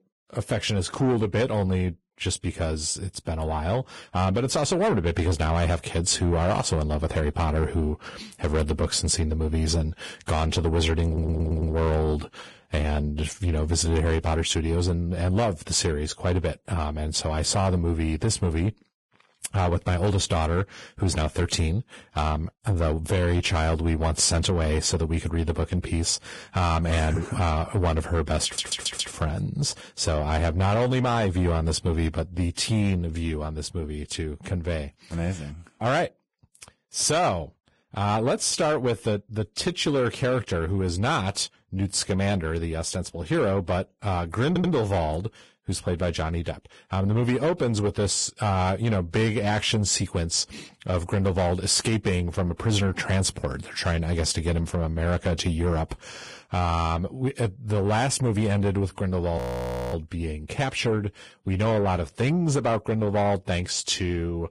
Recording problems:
garbled, watery; badly
distortion; slight; 10 dB below the speech
audio stuttering; at 11 s, at 28 s and at 44 s
audio freezing; at 59 s for 0.5 s

